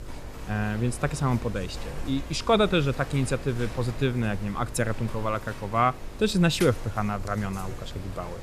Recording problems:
electrical hum; noticeable; throughout; 50 Hz, 20 dB below the speech
animal sounds; noticeable; throughout; 15 dB below the speech

